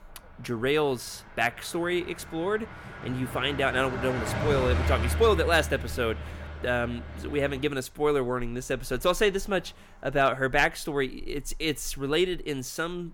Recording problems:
traffic noise; loud; throughout; 6 dB below the speech

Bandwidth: 17 kHz